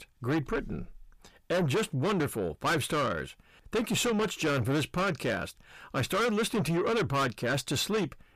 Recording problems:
distortion; heavy; 6 dB below the speech

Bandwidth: 15 kHz